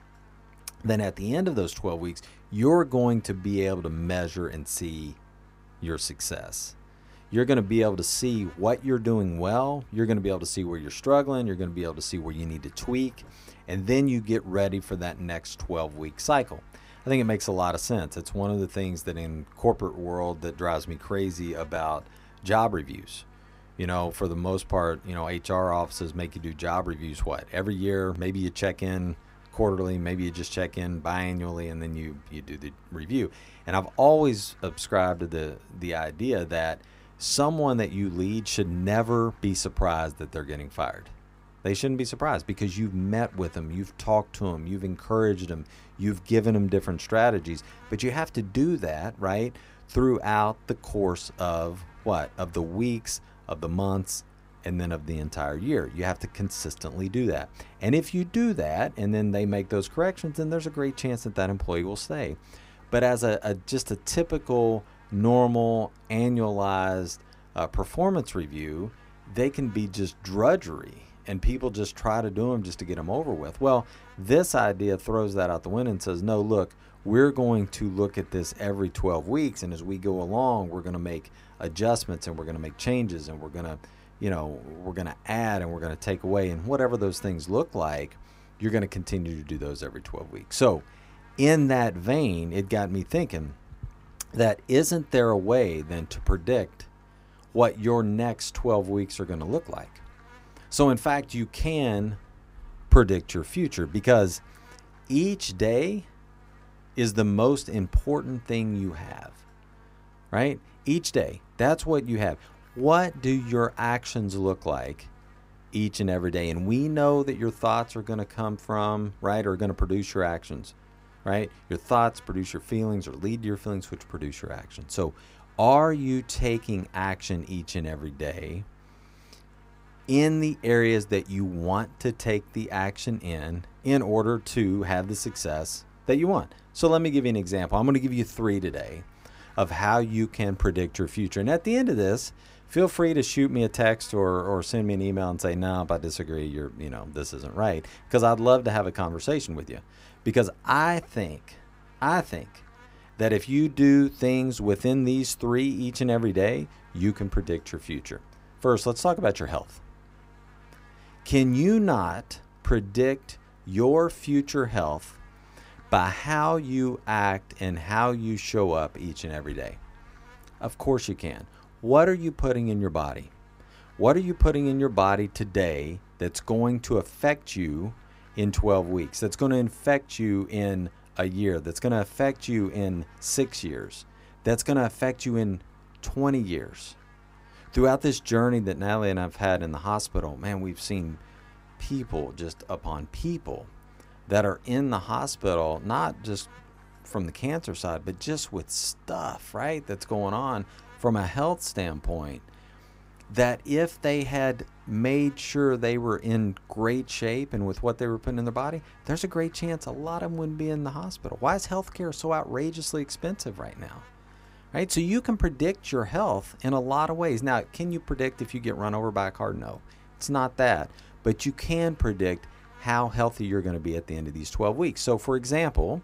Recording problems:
electrical hum; faint; throughout; 50 Hz, 30 dB below the speech

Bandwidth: 15.5 kHz